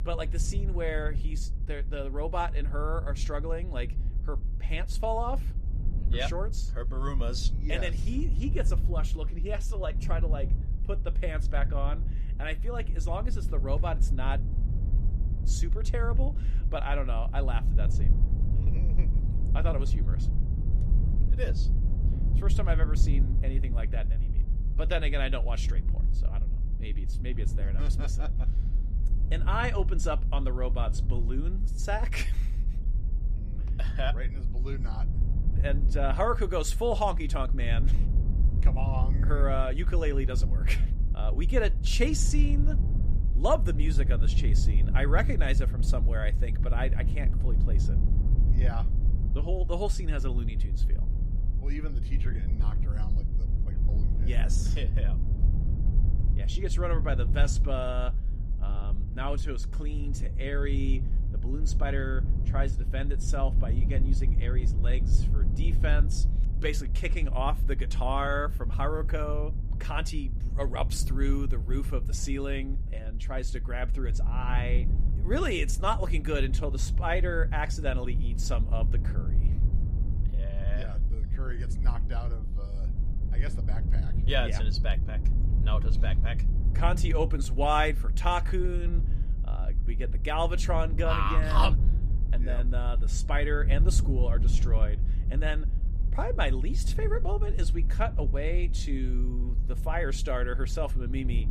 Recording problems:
low rumble; noticeable; throughout; 15 dB below the speech

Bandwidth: 14.5 kHz